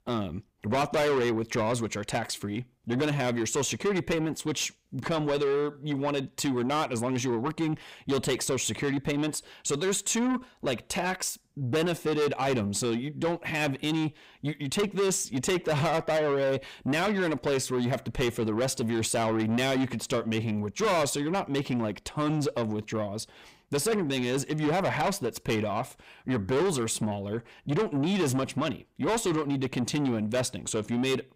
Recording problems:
distortion; heavy; 6 dB below the speech

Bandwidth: 15.5 kHz